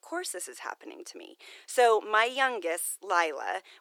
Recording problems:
thin; very; fading below 350 Hz

